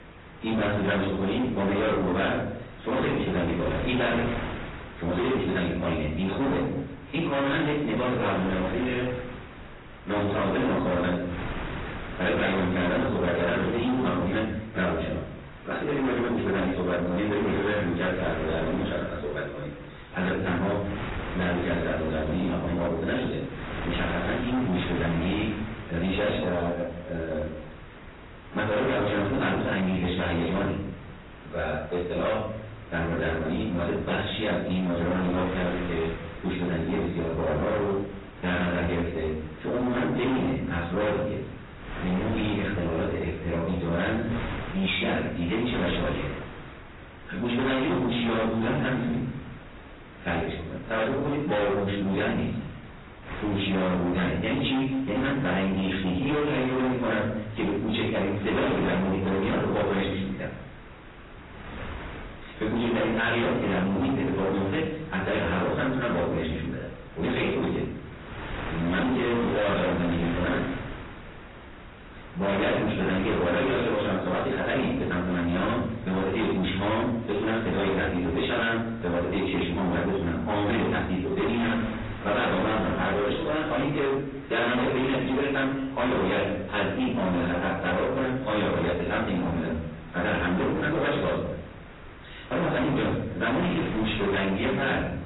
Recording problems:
distortion; heavy; 28% of the sound clipped
off-mic speech; far
garbled, watery; badly; nothing above 4 kHz
wrong speed, natural pitch; too fast; 1.5 times normal speed
room echo; noticeable; dies away in 0.7 s
wind noise on the microphone; occasional gusts; 15 dB below the speech

